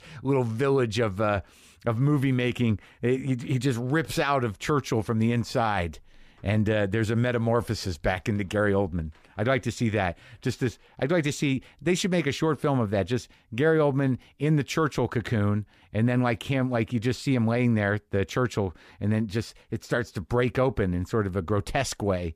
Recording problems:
none

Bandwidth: 14.5 kHz